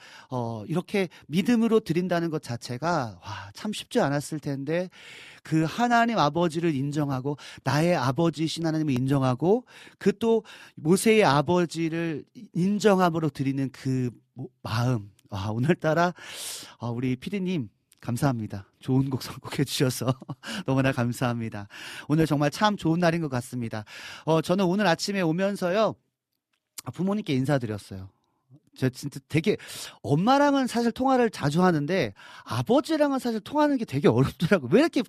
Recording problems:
none

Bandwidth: 14.5 kHz